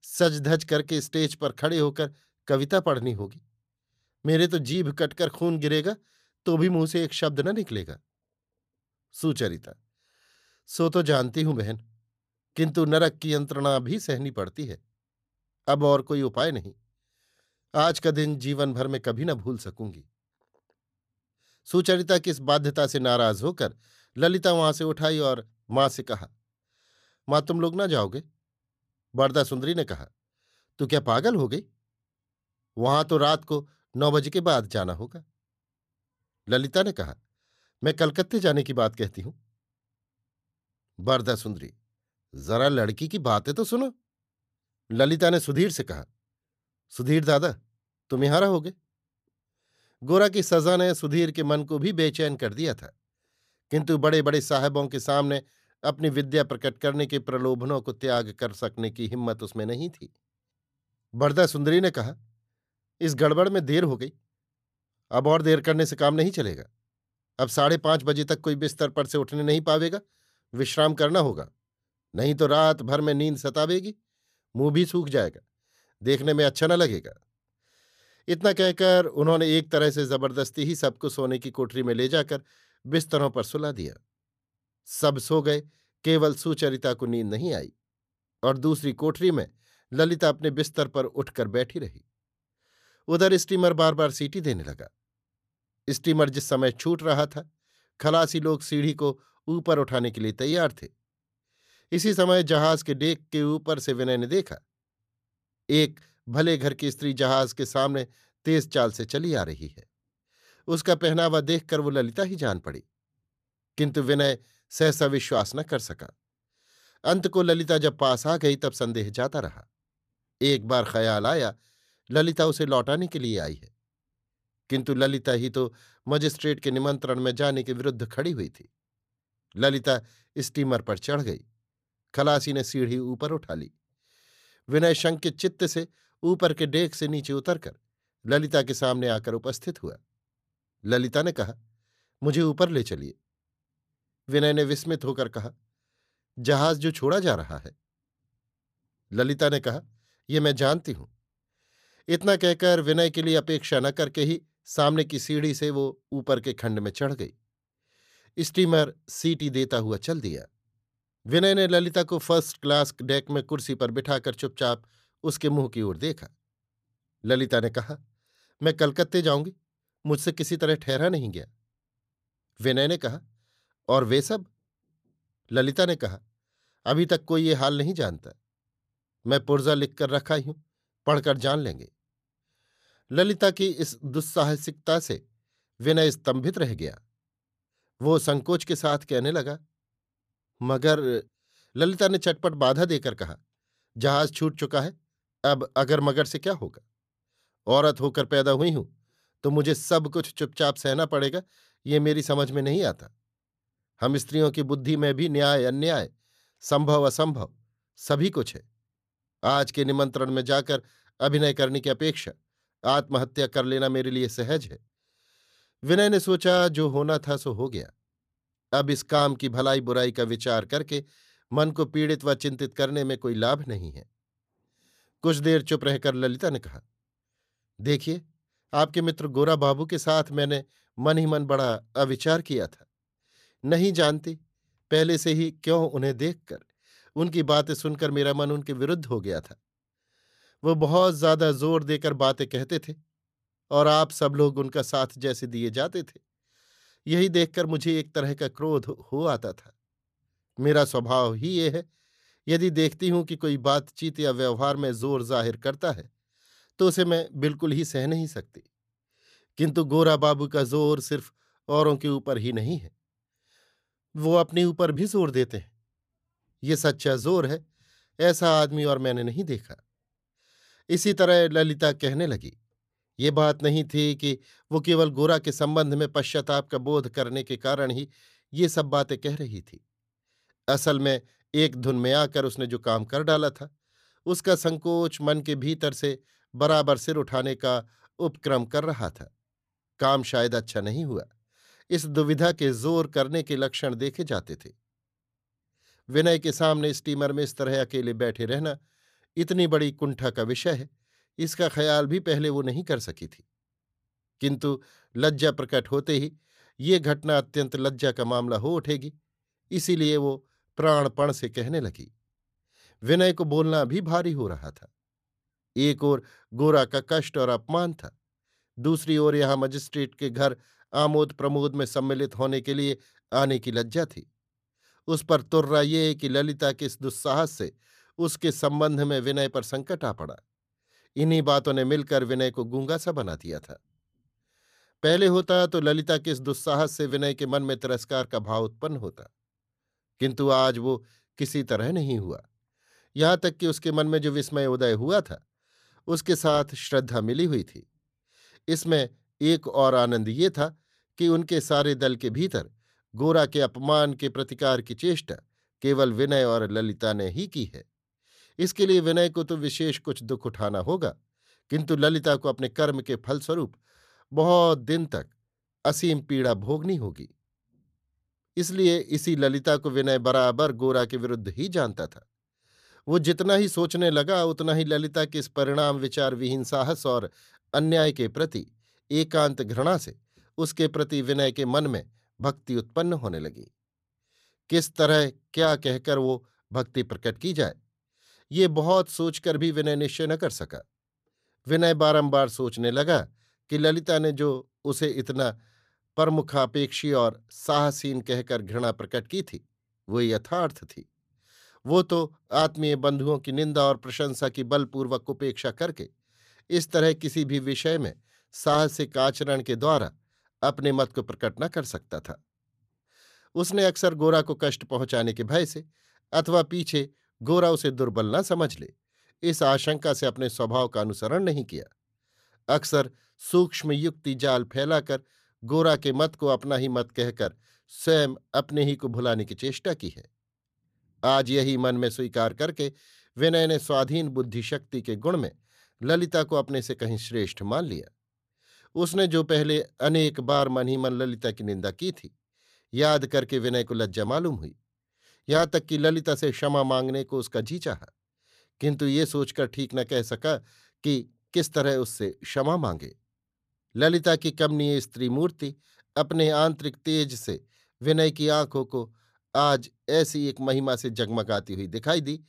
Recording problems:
none

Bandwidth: 14.5 kHz